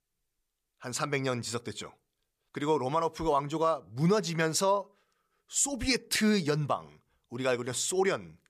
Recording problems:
none

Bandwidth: 14.5 kHz